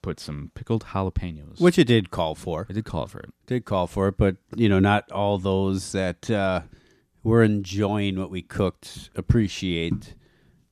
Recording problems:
none

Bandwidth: 14 kHz